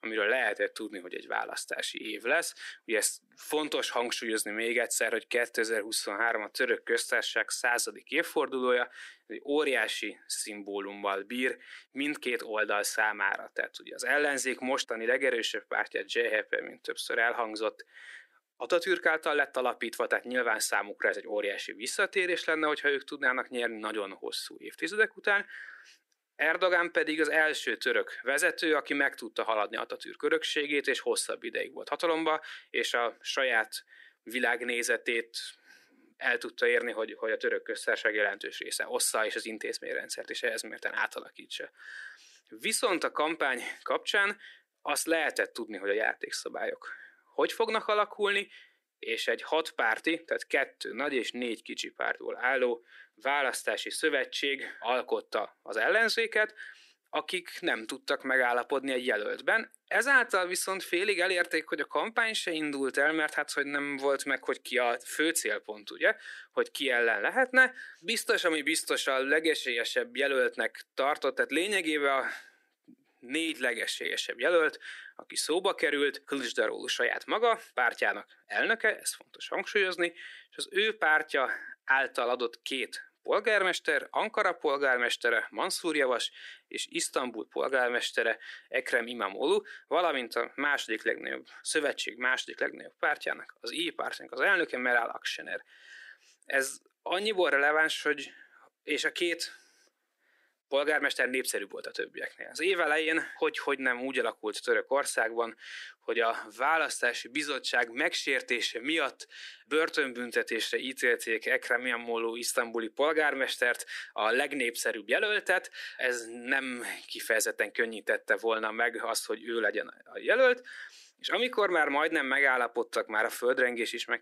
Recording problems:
thin; very; fading below 300 Hz

